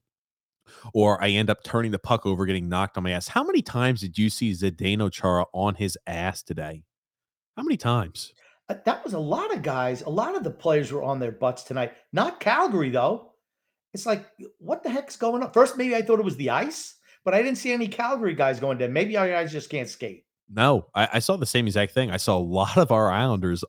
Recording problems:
none

